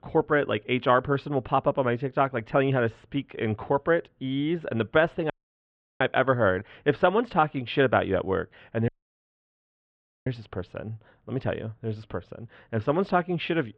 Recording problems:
muffled; very; fading above 3 kHz
audio cutting out; at 5.5 s for 0.5 s and at 9 s for 1.5 s

